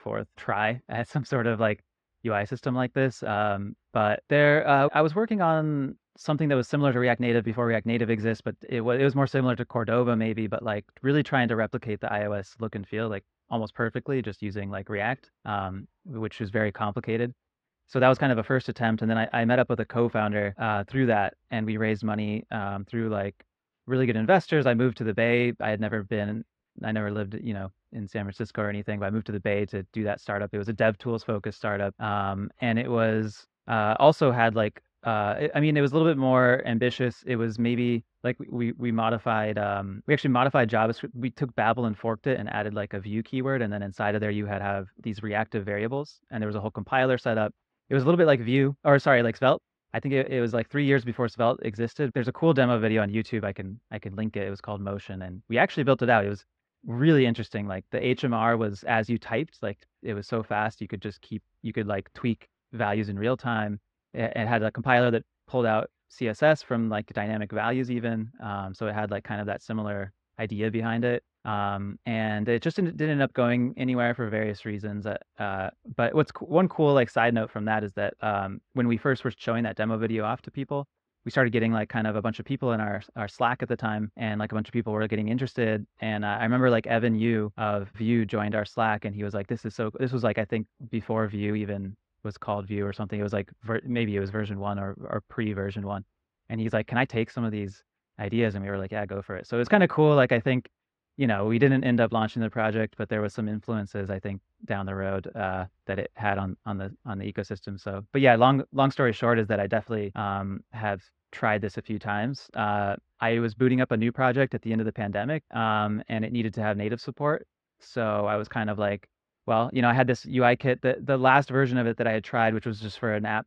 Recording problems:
muffled; very; fading above 2 kHz

